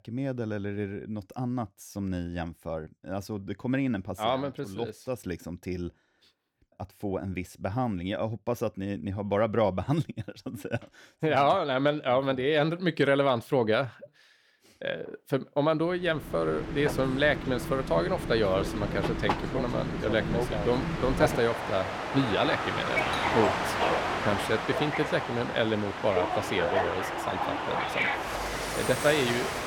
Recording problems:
train or aircraft noise; loud; from 16 s on; 1 dB below the speech
doorbell; faint; from 23 to 25 s; peak 10 dB below the speech

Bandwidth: 18.5 kHz